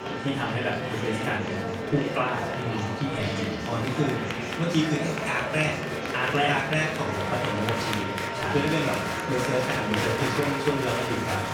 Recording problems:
off-mic speech; far
room echo; noticeable; dies away in 0.4 s
background music; loud; throughout; 9 dB below the speech
murmuring crowd; loud; throughout; 2 dB below the speech

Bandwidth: 18.5 kHz